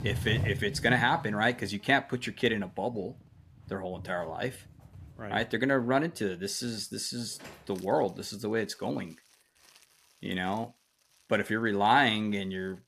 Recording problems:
household noises; noticeable; throughout; 10 dB below the speech

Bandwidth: 14.5 kHz